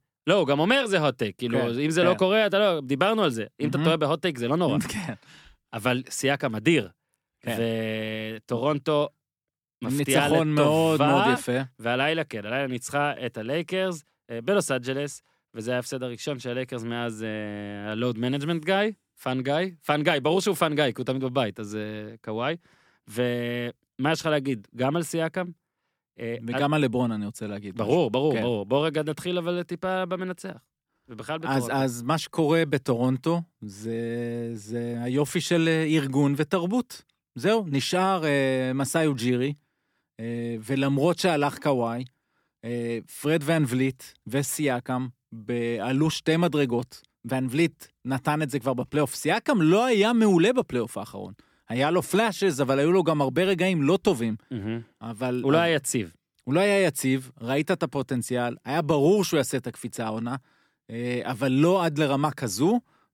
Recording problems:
none

